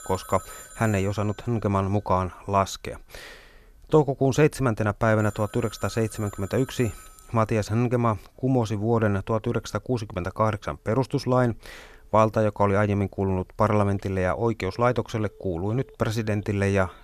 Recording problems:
alarms or sirens; faint; throughout; 20 dB below the speech

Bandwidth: 14 kHz